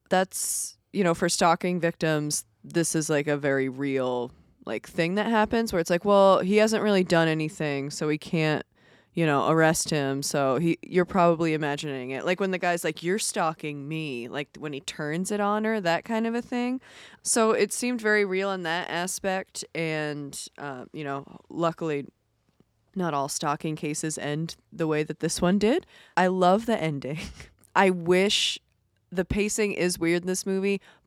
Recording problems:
none

